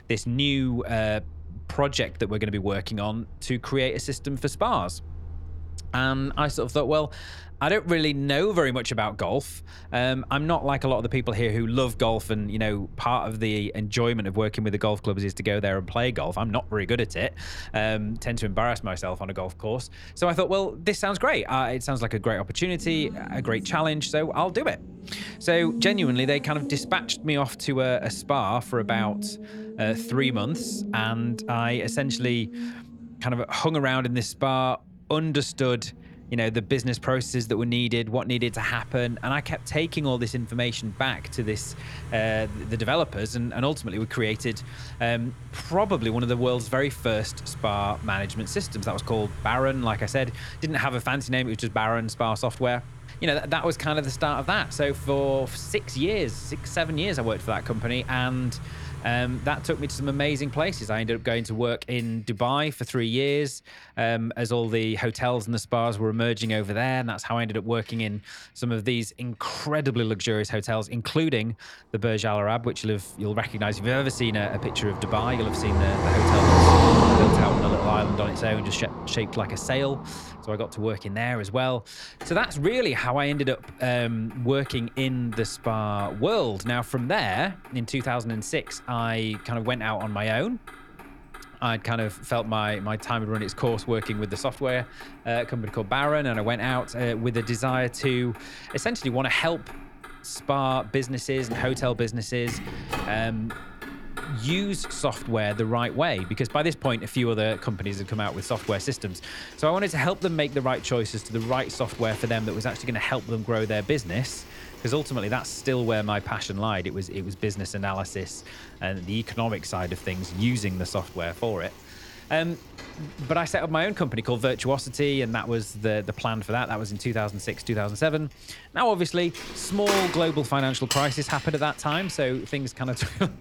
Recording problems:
traffic noise; loud; throughout; 6 dB below the speech

